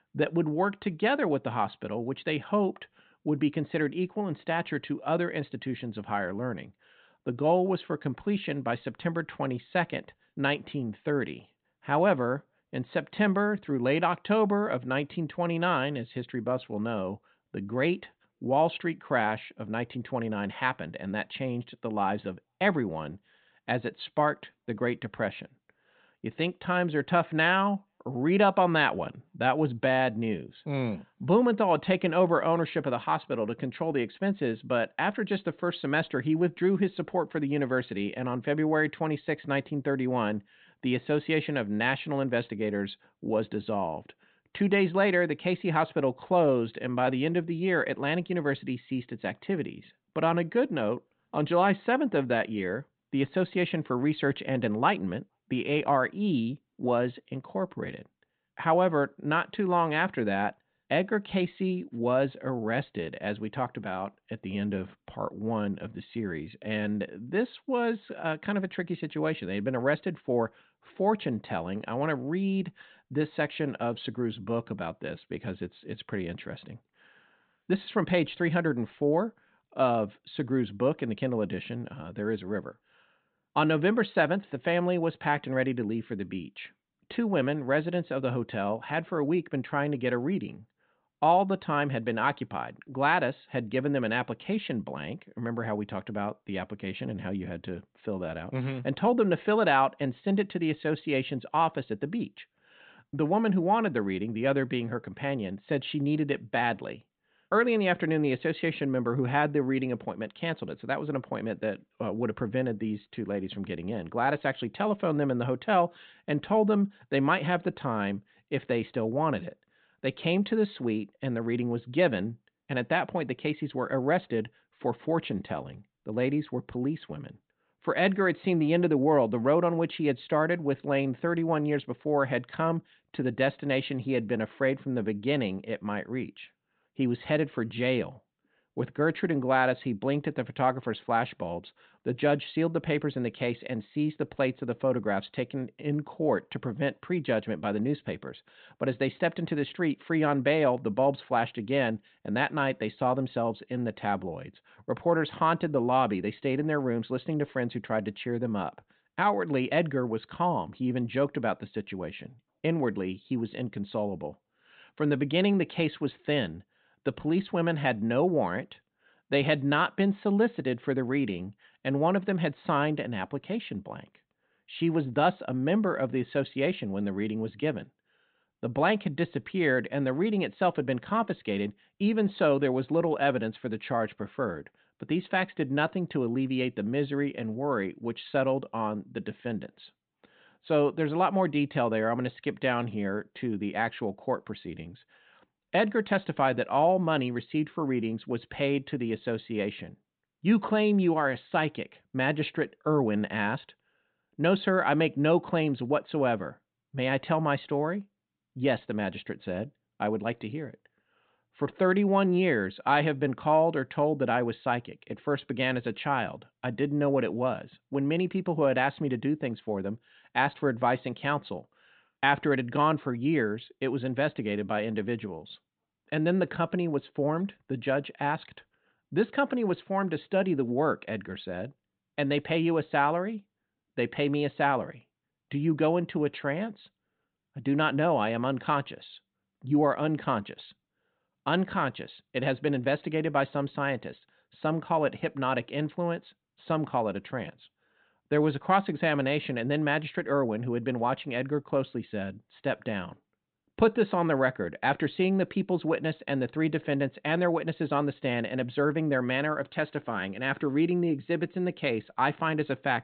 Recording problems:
high frequencies cut off; severe; nothing above 4 kHz

